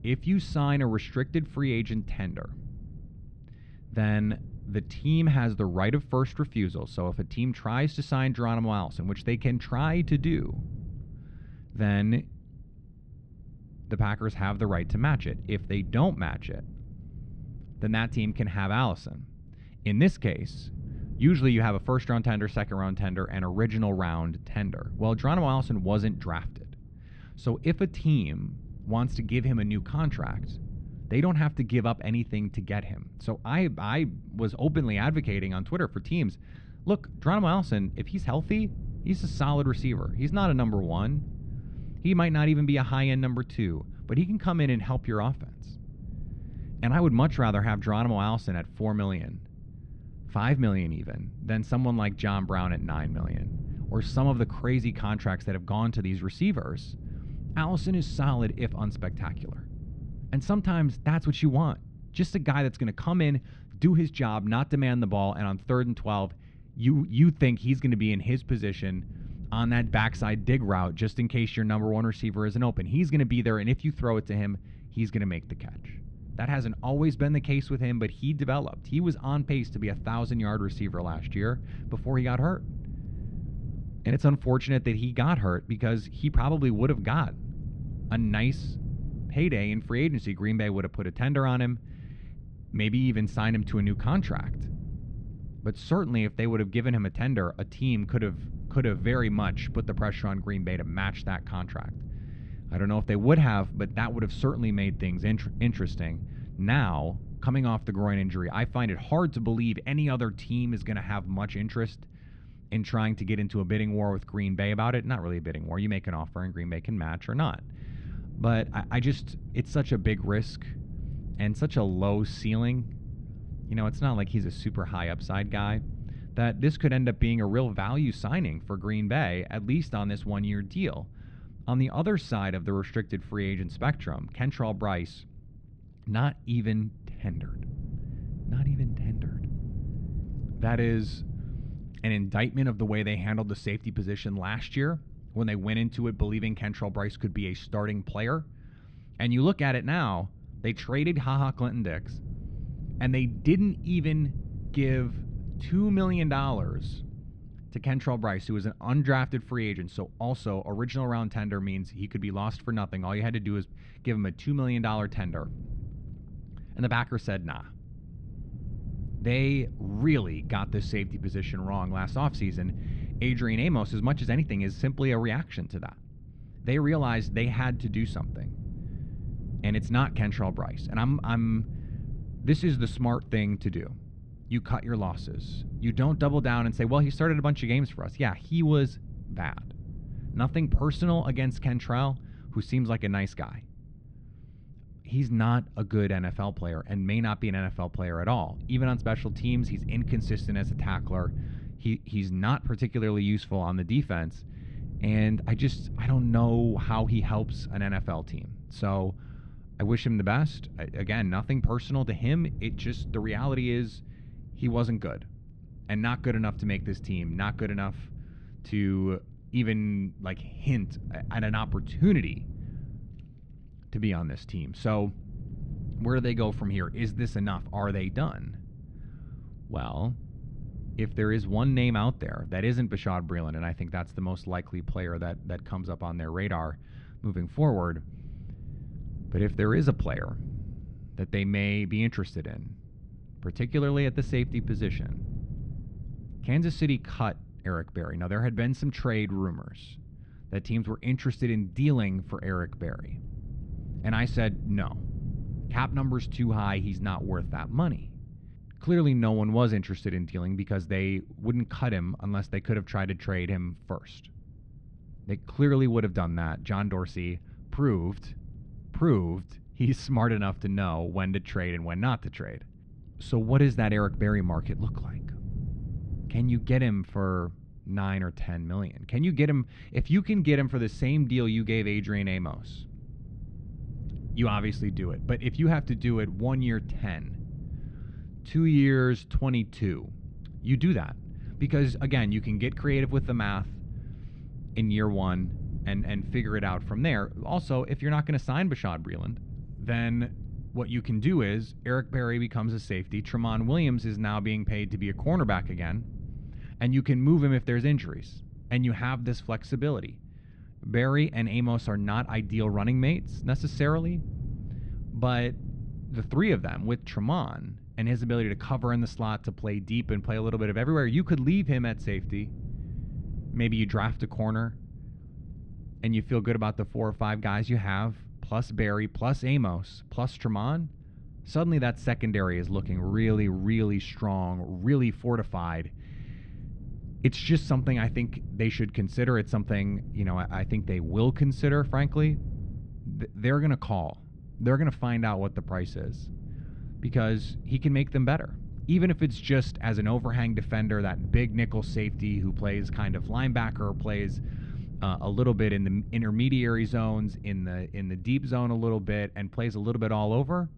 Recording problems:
muffled; slightly; fading above 3.5 kHz
wind noise on the microphone; occasional gusts; 20 dB below the speech

